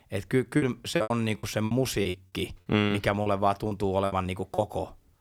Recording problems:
choppy; very; from 0.5 to 4.5 s; 17% of the speech affected

